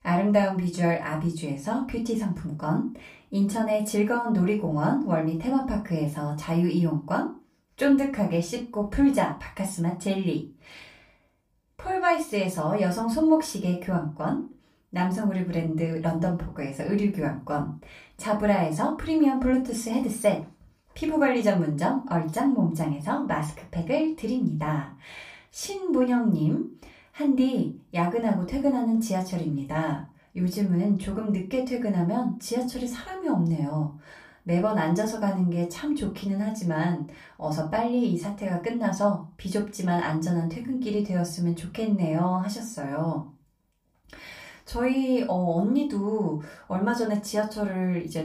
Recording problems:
off-mic speech; far
room echo; very slight; dies away in 0.3 s

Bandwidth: 15 kHz